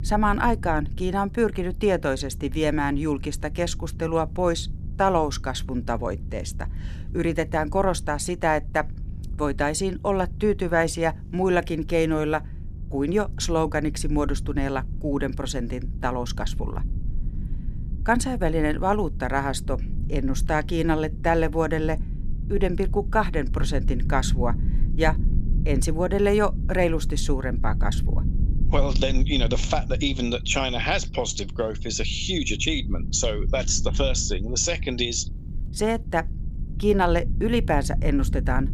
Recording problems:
electrical hum; faint; throughout; 50 Hz, 30 dB below the speech
low rumble; faint; throughout; 20 dB below the speech

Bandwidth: 14.5 kHz